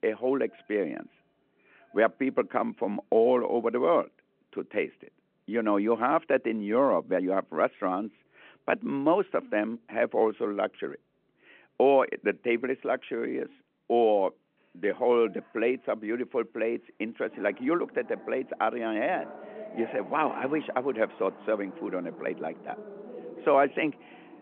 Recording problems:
phone-call audio
traffic noise; noticeable; throughout; 20 dB below the speech

